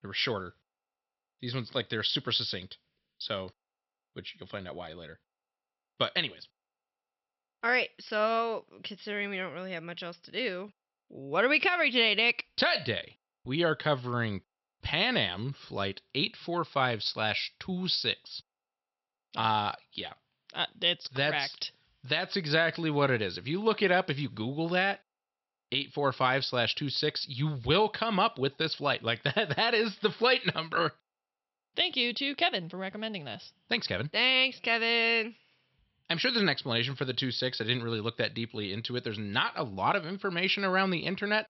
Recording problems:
high frequencies cut off; noticeable; nothing above 5.5 kHz

